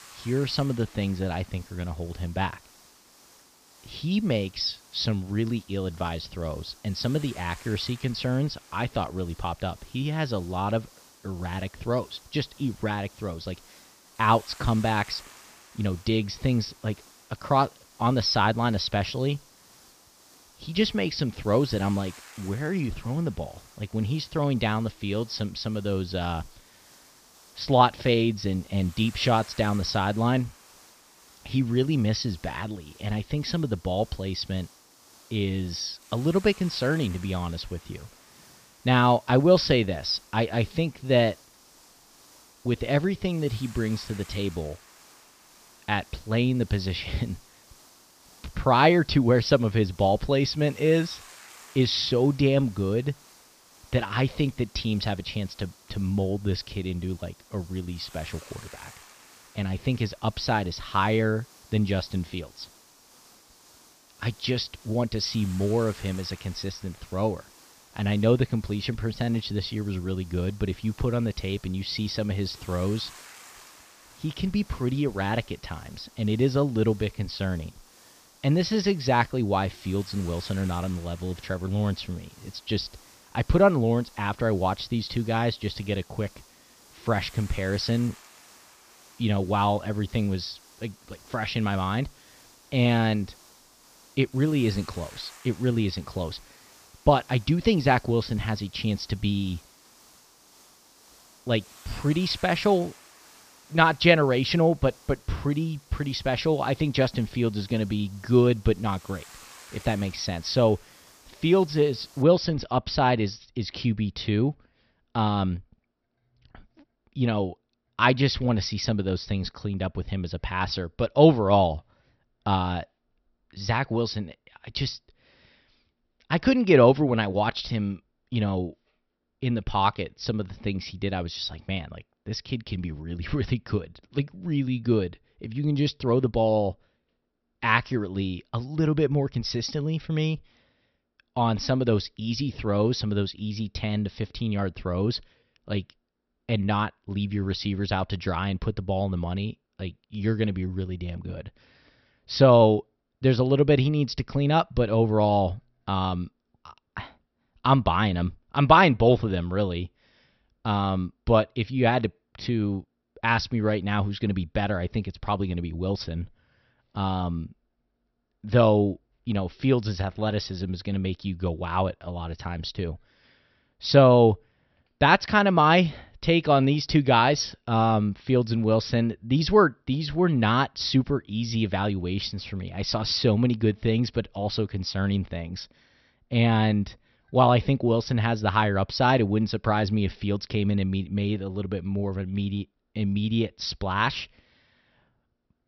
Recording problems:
high frequencies cut off; noticeable; nothing above 6 kHz
hiss; faint; until 1:52; 25 dB below the speech

